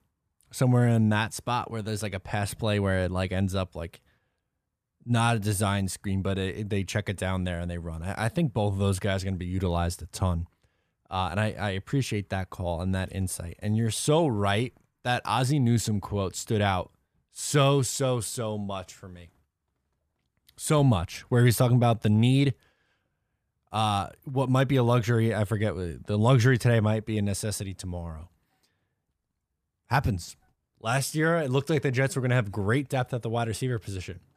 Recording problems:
none

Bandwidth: 14.5 kHz